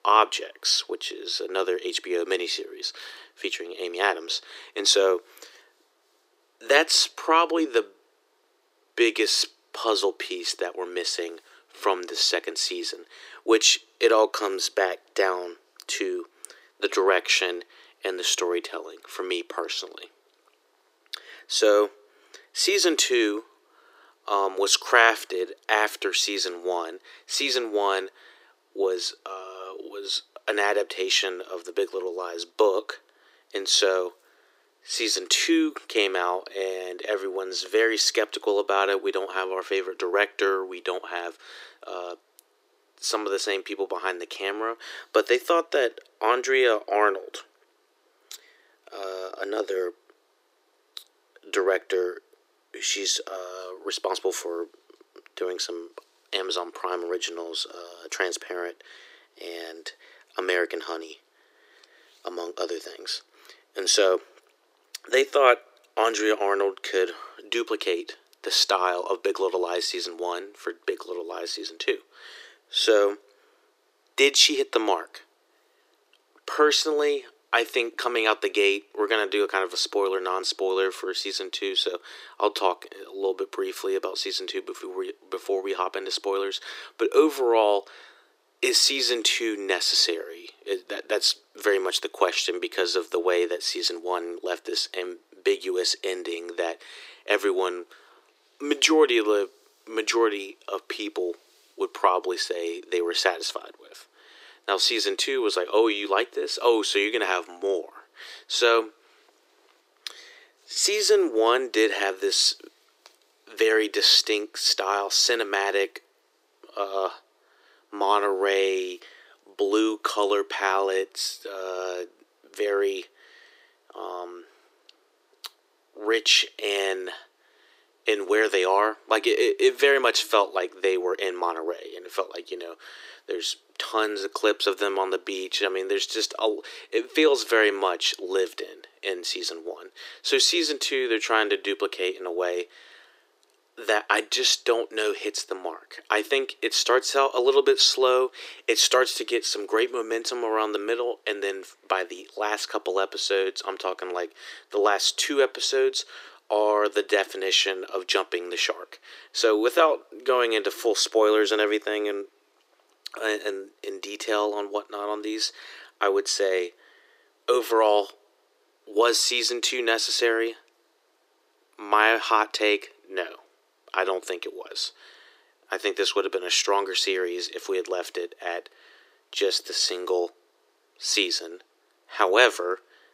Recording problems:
thin; very; fading below 300 Hz

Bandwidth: 15.5 kHz